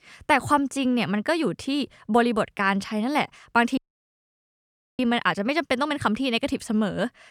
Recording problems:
audio cutting out; at 4 s for 1 s

